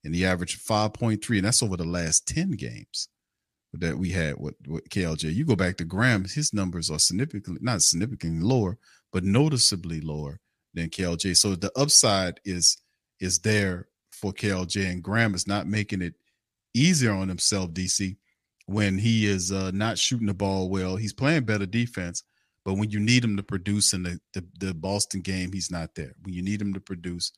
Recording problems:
choppy; occasionally; at 14 s; 1% of the speech affected

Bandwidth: 15 kHz